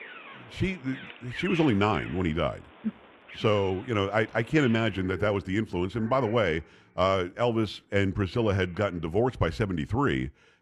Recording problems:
muffled; slightly; fading above 2.5 kHz
animal sounds; noticeable; throughout; 15 dB below the speech

